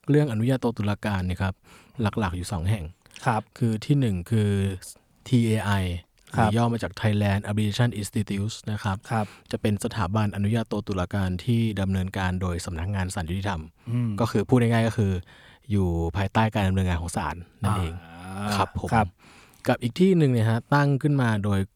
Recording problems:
none

